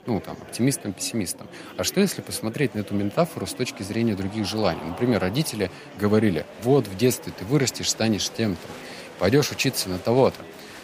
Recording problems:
murmuring crowd; noticeable; throughout; 15 dB below the speech

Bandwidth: 15 kHz